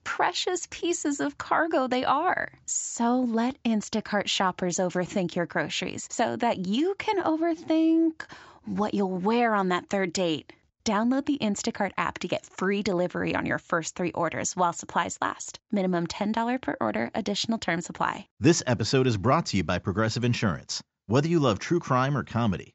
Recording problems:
high frequencies cut off; noticeable; nothing above 7.5 kHz

